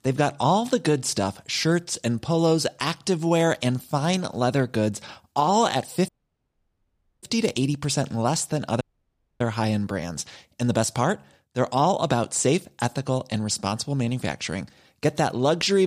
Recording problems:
audio cutting out; at 6 s for 1 s and at 9 s for 0.5 s
abrupt cut into speech; at the end

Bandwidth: 15 kHz